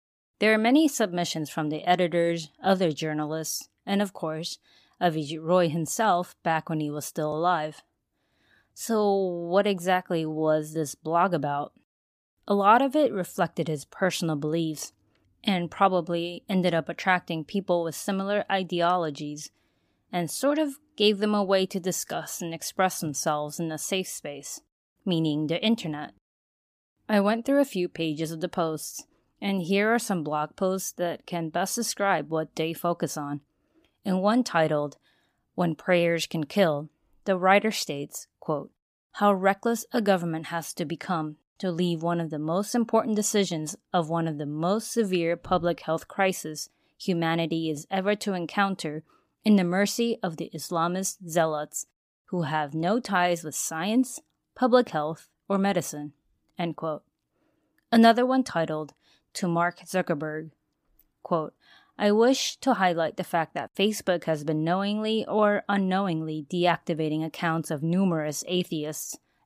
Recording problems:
none

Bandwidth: 15 kHz